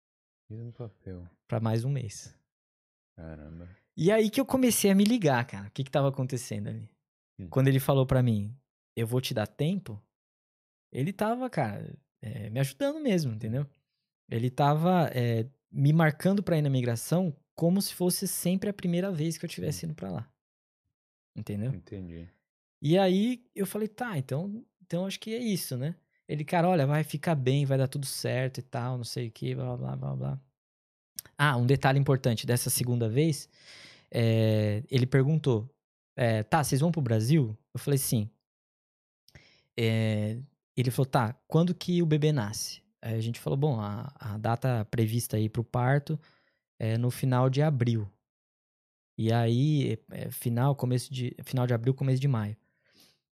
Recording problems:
none

